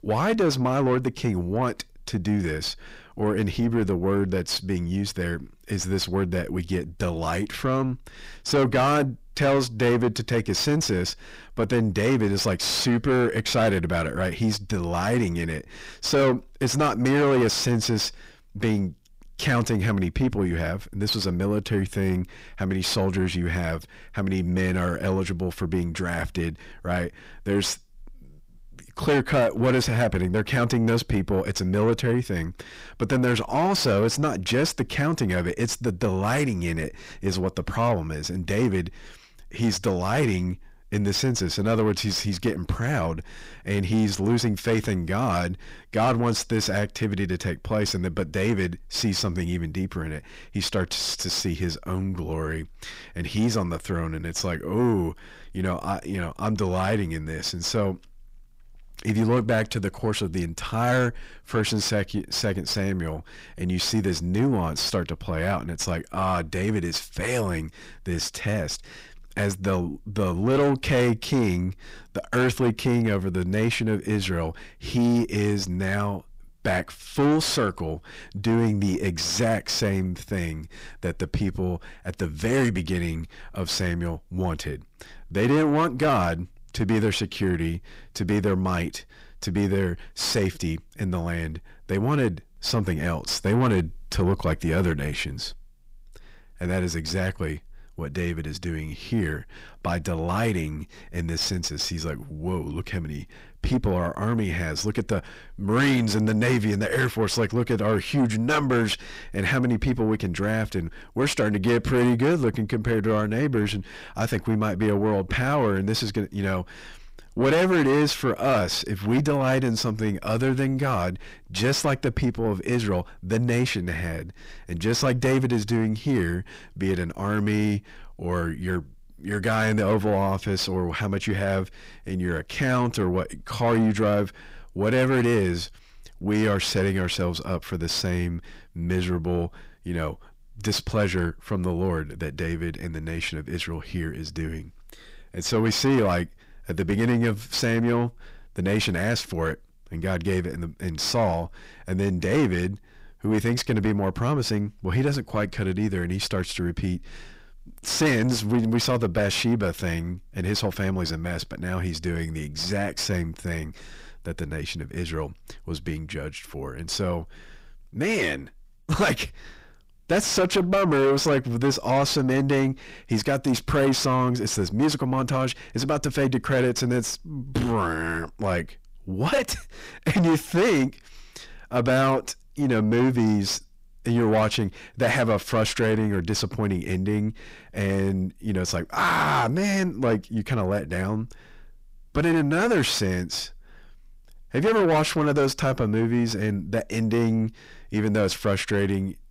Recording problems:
distortion; heavy; 6 dB below the speech

